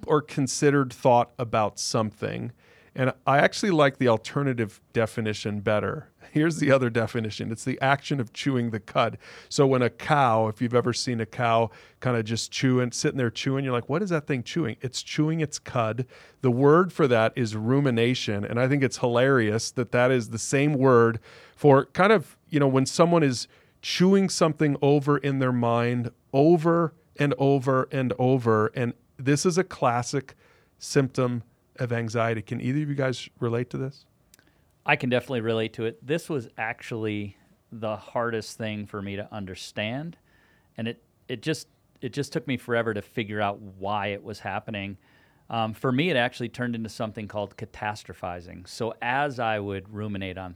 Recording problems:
none

